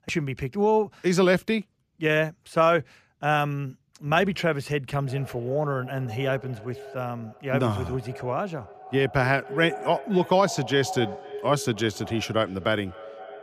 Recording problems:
echo of what is said; noticeable; from 5 s on; 250 ms later, 15 dB below the speech

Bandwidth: 14.5 kHz